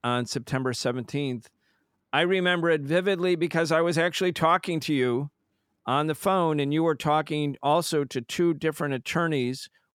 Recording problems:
none

